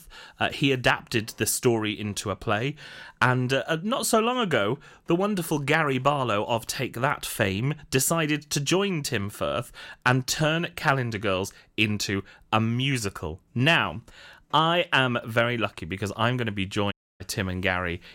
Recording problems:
audio cutting out; at 17 s

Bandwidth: 16 kHz